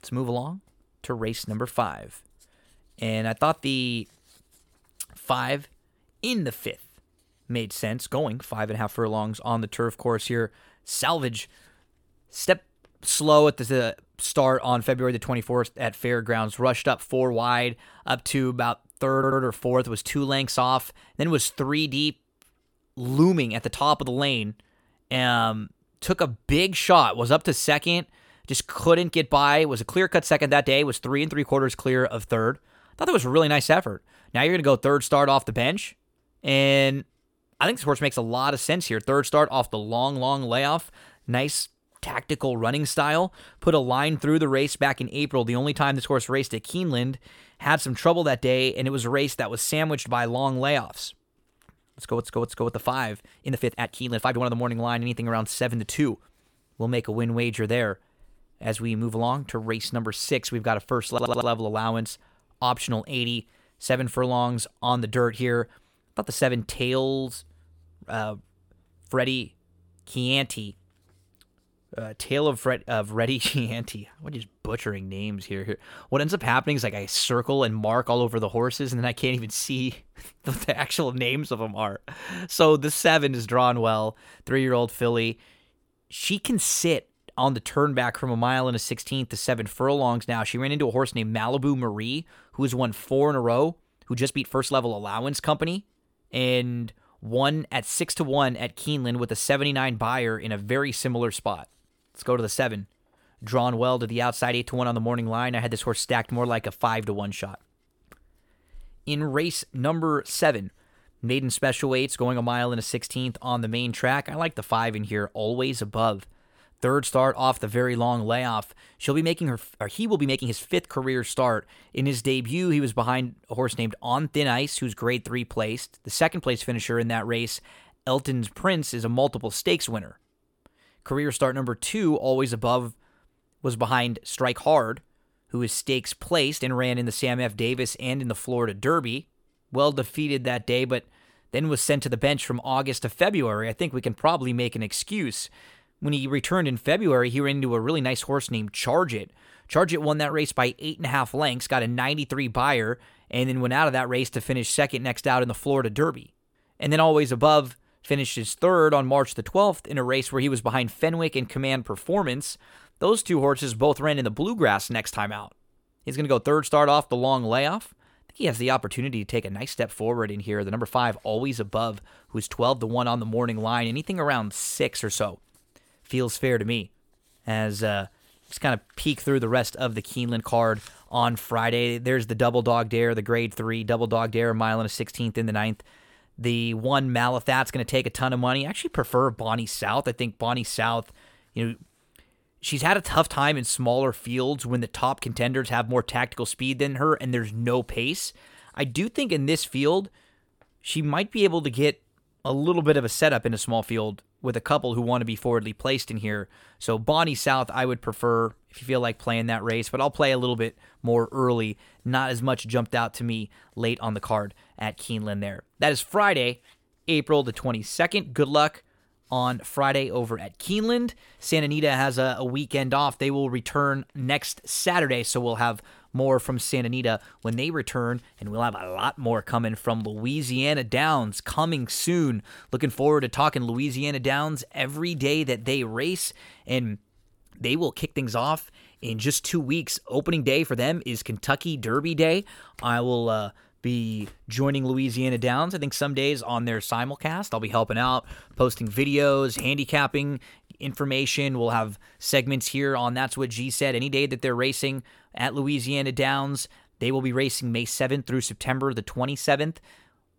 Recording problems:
uneven, jittery; strongly; from 11 s to 4:01
audio stuttering; at 19 s, at 52 s and at 1:01

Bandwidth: 18 kHz